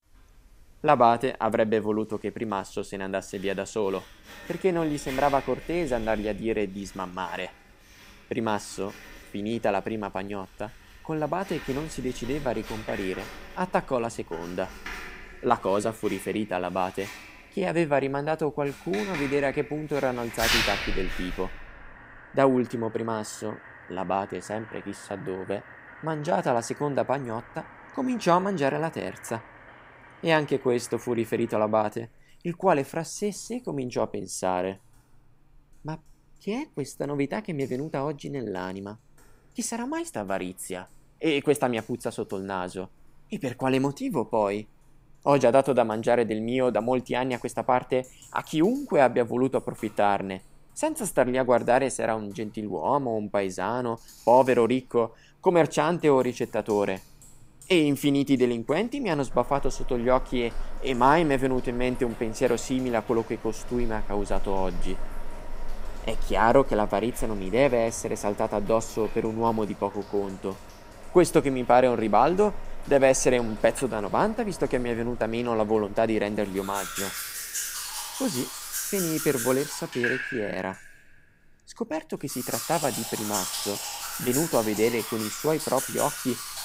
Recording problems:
household noises; loud; throughout; 10 dB below the speech

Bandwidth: 15.5 kHz